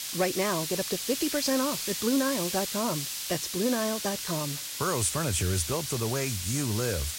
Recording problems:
garbled, watery; badly; nothing above 10.5 kHz
hiss; loud; throughout; 3 dB below the speech
household noises; noticeable; throughout; 20 dB below the speech

